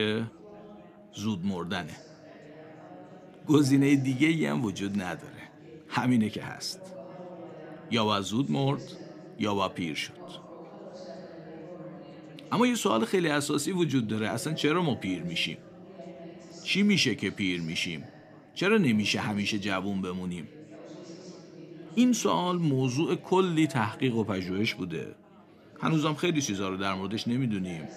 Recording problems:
chatter from many people; noticeable; throughout; 20 dB below the speech
abrupt cut into speech; at the start

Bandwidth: 15 kHz